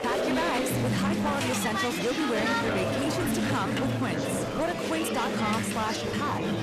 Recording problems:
distortion; slight; 19% of the sound clipped
chatter from many people; very loud; throughout; 2 dB above the speech

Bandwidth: 14 kHz